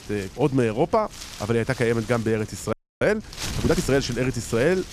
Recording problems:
wind noise on the microphone; occasional gusts; 15 dB below the speech
audio freezing; at 2.5 s

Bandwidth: 14.5 kHz